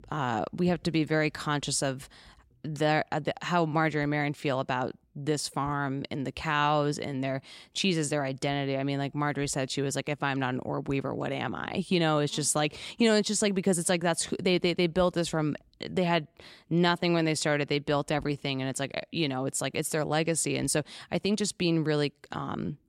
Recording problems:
none

